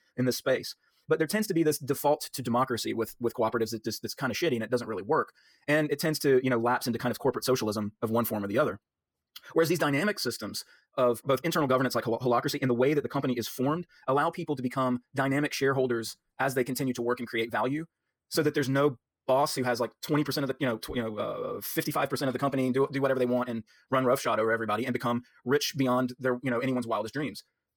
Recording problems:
wrong speed, natural pitch; too fast; 1.6 times normal speed

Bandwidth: 18.5 kHz